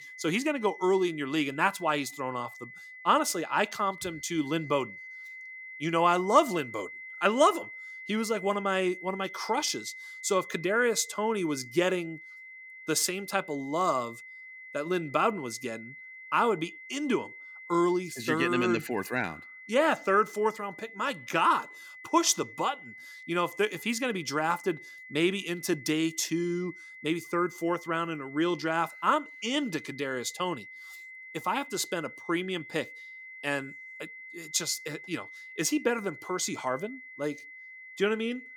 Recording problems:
high-pitched whine; noticeable; throughout; 2 kHz, 15 dB below the speech

